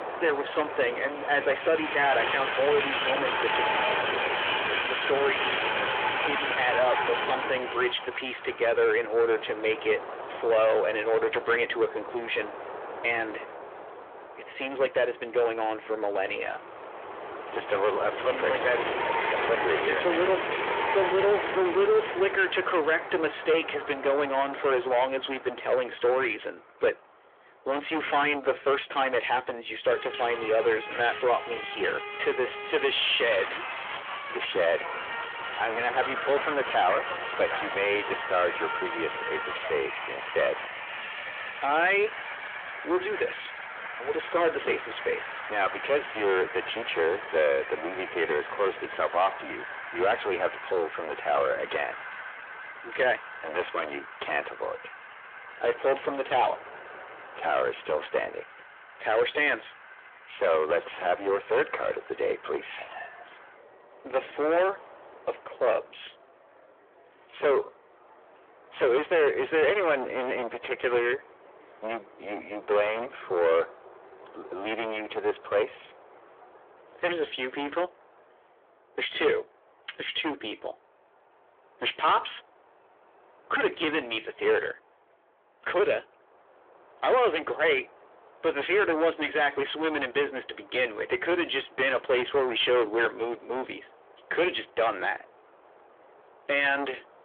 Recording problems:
distortion; heavy; 7 dB below the speech
phone-call audio; nothing above 3.5 kHz
train or aircraft noise; loud; throughout; 5 dB below the speech

